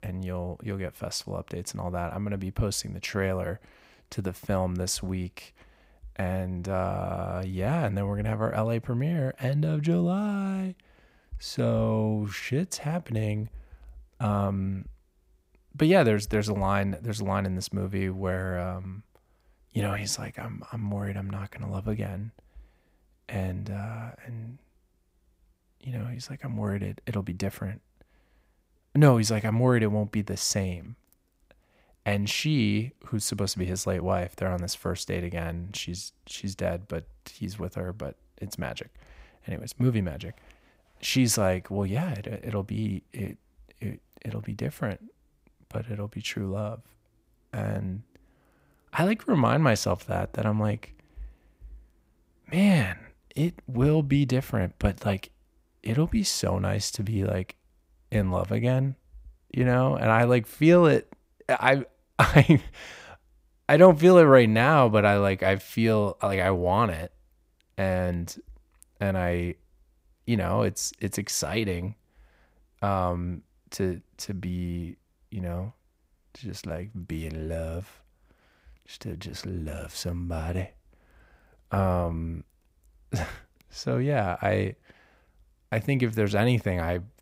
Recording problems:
none

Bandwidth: 15.5 kHz